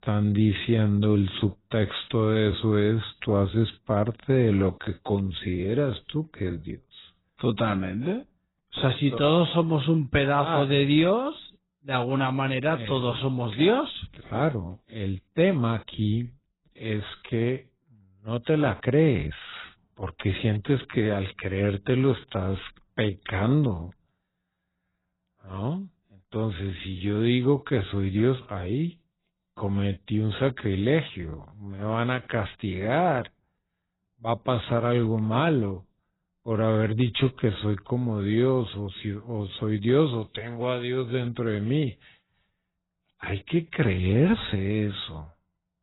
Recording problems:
garbled, watery; badly; nothing above 4 kHz
wrong speed, natural pitch; too slow; 0.7 times normal speed

